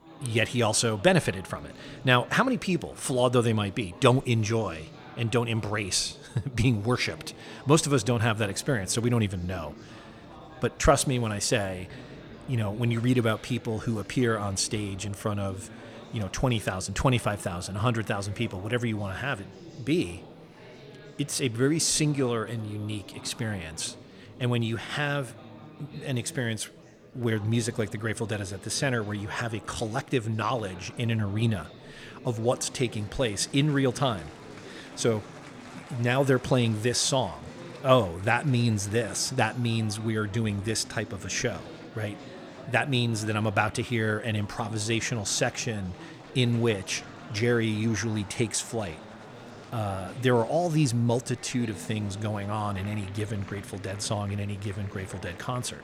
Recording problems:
murmuring crowd; noticeable; throughout; 20 dB below the speech

